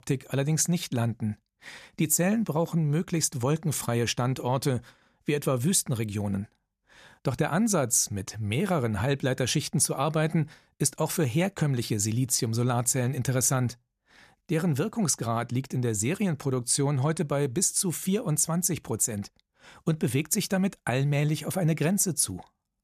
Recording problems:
none

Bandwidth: 14.5 kHz